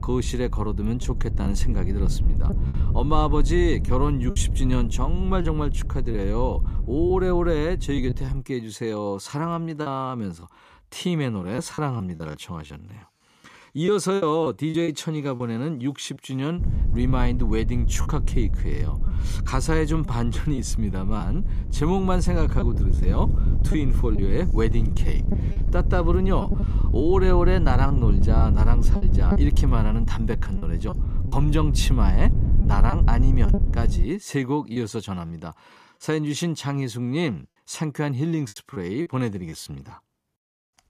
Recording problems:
wind noise on the microphone; occasional gusts; until 8.5 s and from 17 to 34 s; 10 dB below the speech
choppy; occasionally; 4% of the speech affected

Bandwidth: 14.5 kHz